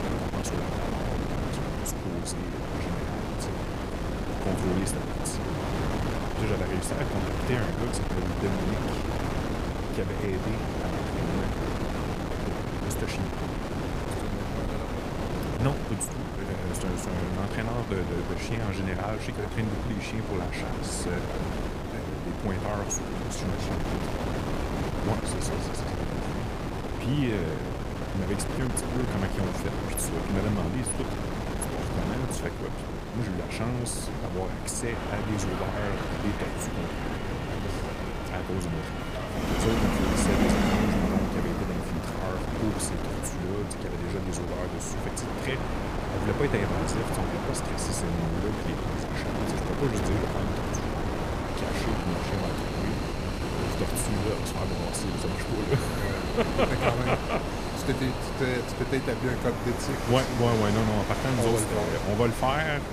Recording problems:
wind noise on the microphone; heavy; as loud as the speech
train or aircraft noise; loud; from 35 s on; 2 dB below the speech

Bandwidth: 15 kHz